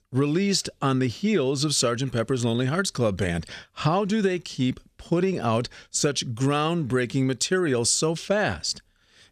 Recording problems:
none

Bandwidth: 14 kHz